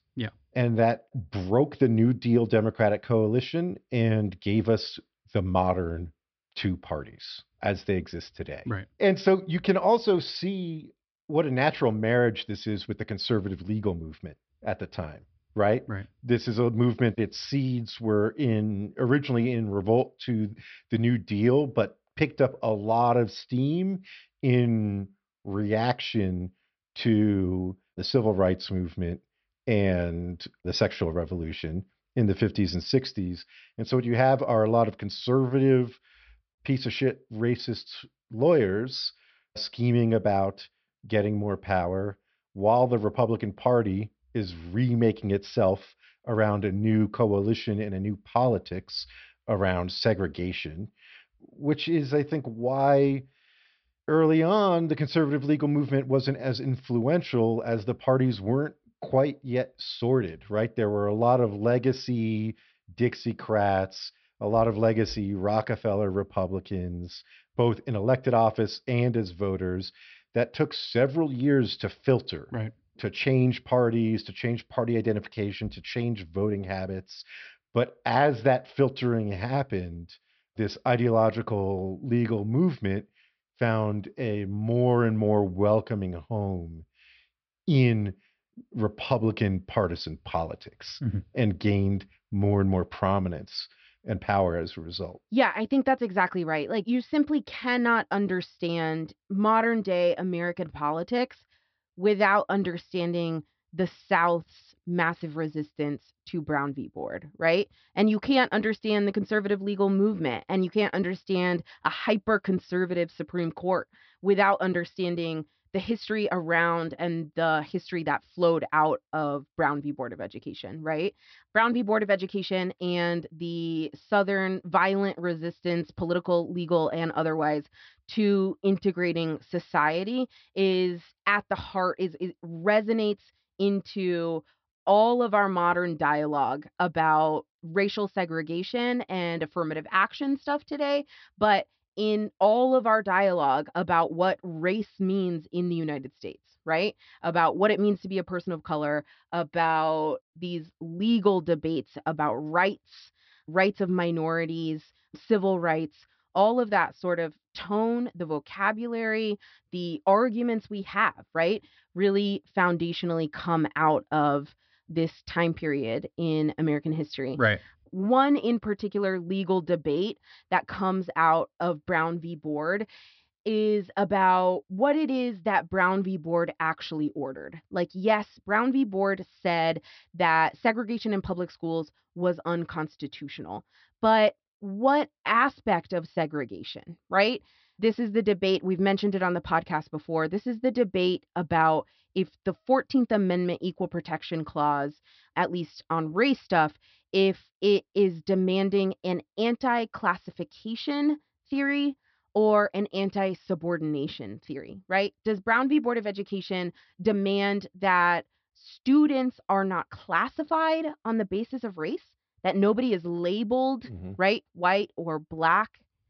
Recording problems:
high frequencies cut off; noticeable; nothing above 5.5 kHz

